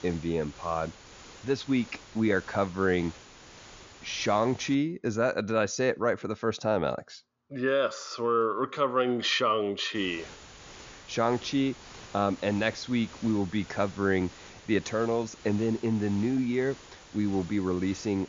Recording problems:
high frequencies cut off; noticeable; nothing above 7 kHz
hiss; noticeable; until 5 s and from 10 s on; 20 dB below the speech

